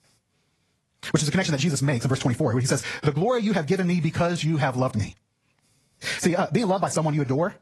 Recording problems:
wrong speed, natural pitch; too fast; 1.7 times normal speed
garbled, watery; slightly; nothing above 11 kHz
squashed, flat; somewhat

